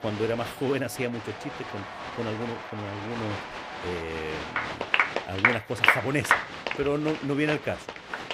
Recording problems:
crowd noise; very loud; throughout; 2 dB above the speech

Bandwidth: 15.5 kHz